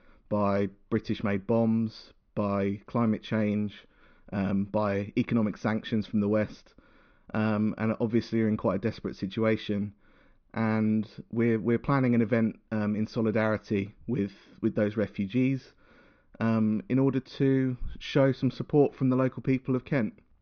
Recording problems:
high frequencies cut off; noticeable; nothing above 6.5 kHz
muffled; very slightly; fading above 3.5 kHz

